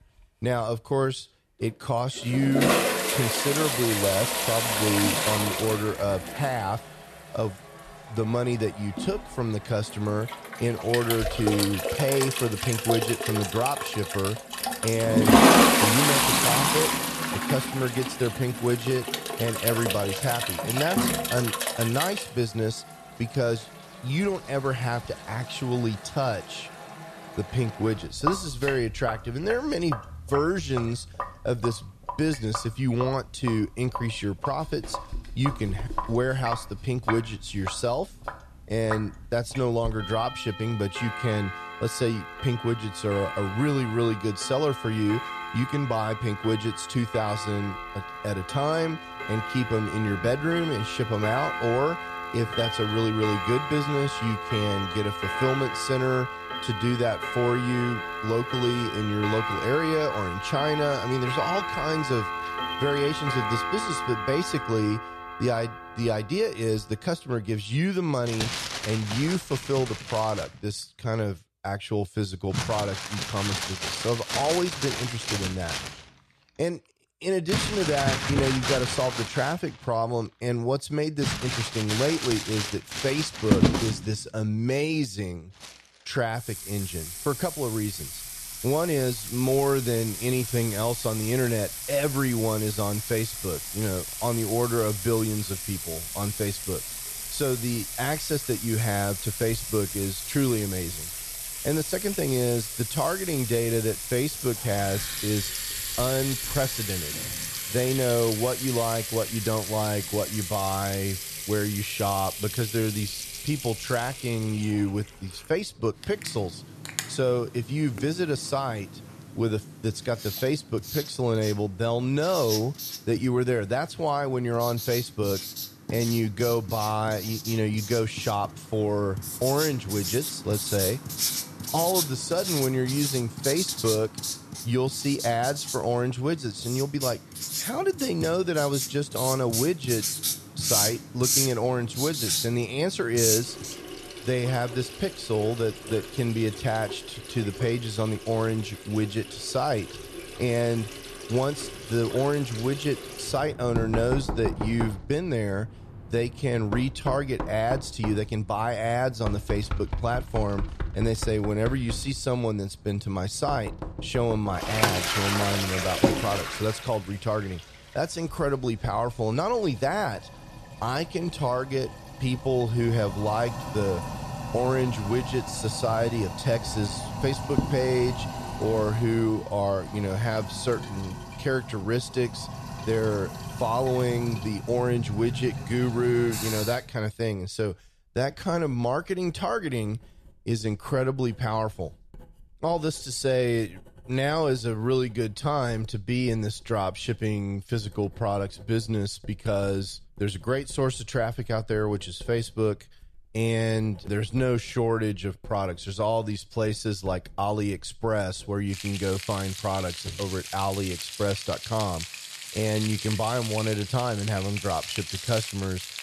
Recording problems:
household noises; loud; throughout; 2 dB below the speech

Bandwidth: 13.5 kHz